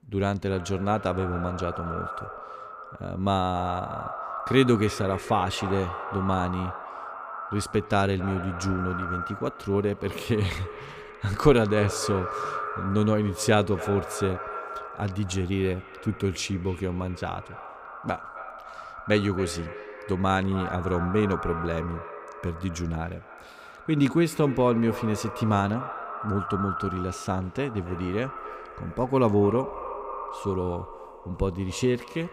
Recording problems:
echo of what is said; strong; throughout; 270 ms later, 10 dB below the speech

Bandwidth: 15.5 kHz